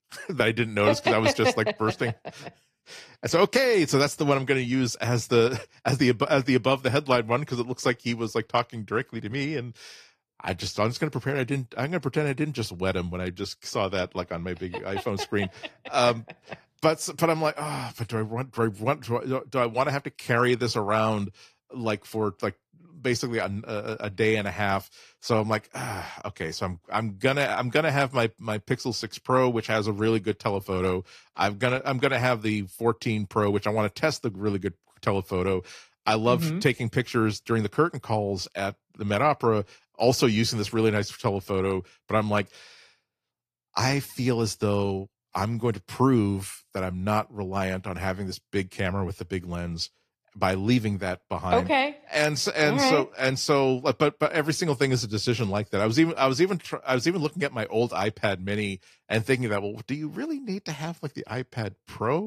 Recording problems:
garbled, watery; slightly; nothing above 14.5 kHz
abrupt cut into speech; at the end

